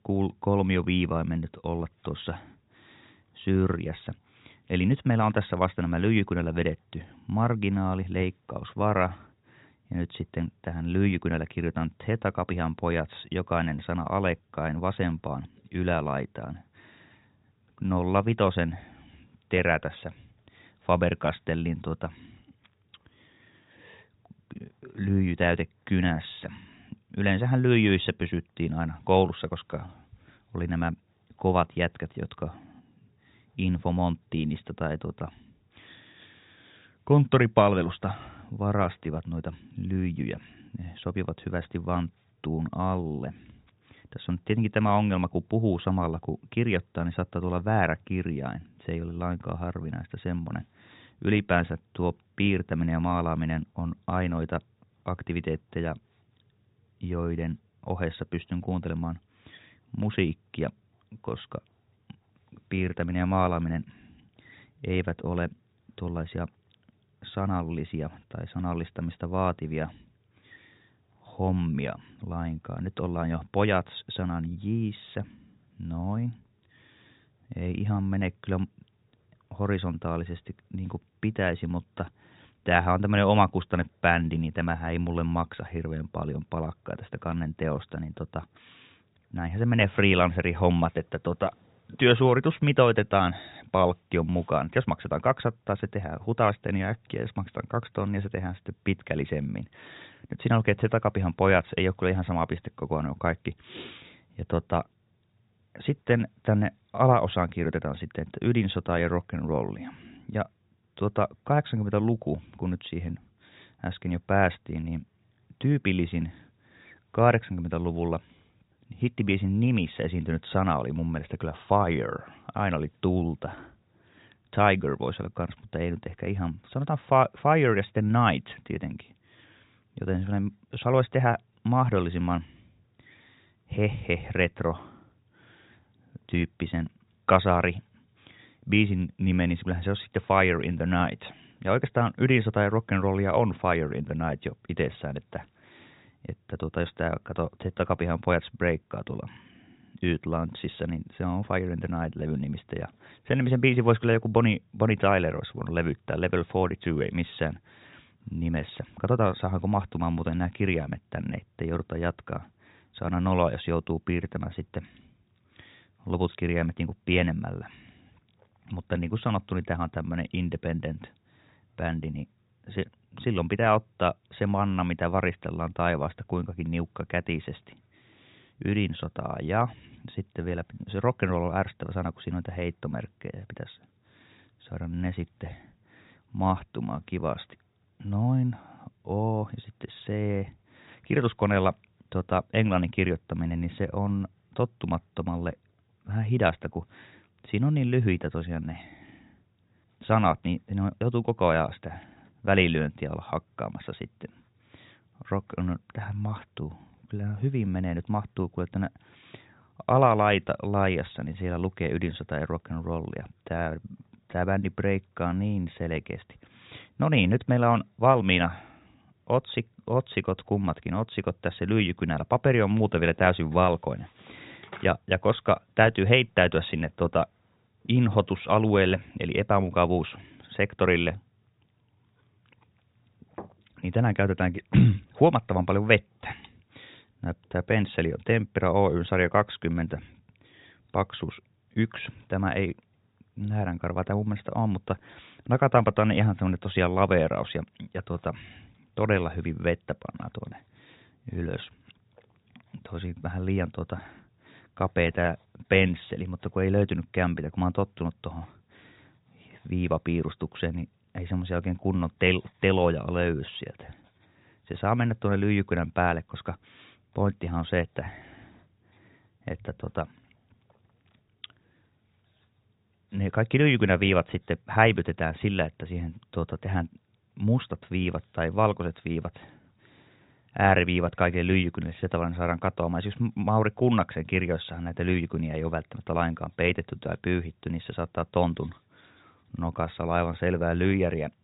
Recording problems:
high frequencies cut off; severe; nothing above 4 kHz

